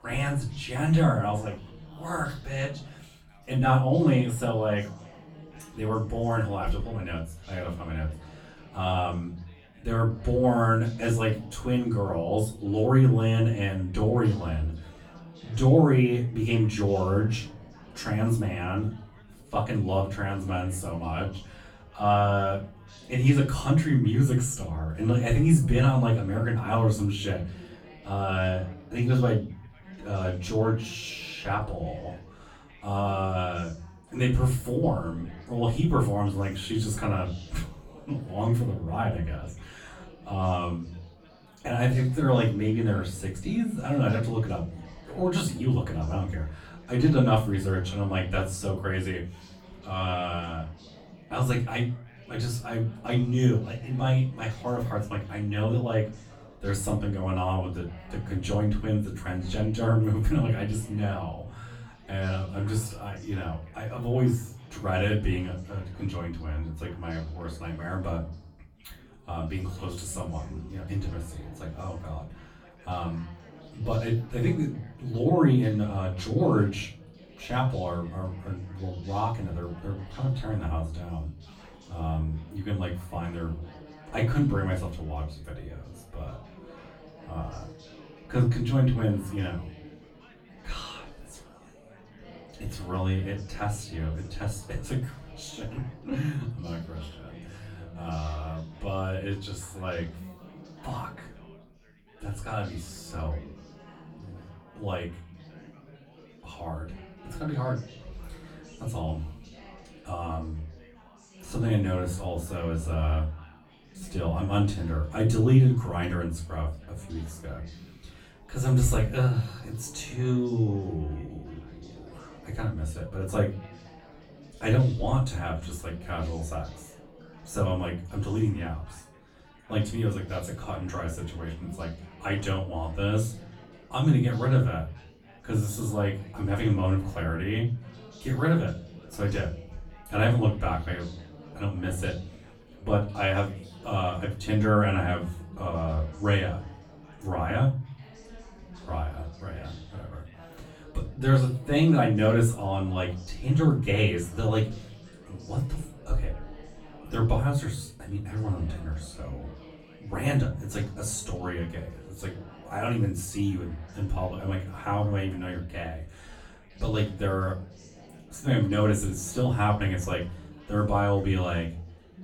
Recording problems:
off-mic speech; far
room echo; slight; dies away in 0.3 s
chatter from many people; faint; throughout; 20 dB below the speech

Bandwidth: 17 kHz